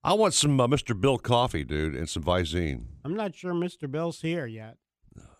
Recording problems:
none

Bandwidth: 14.5 kHz